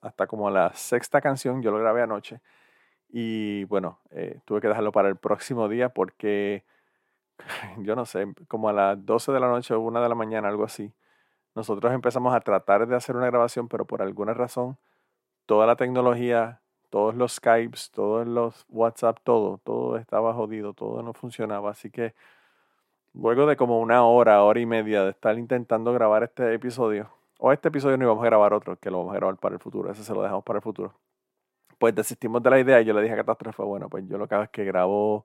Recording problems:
none

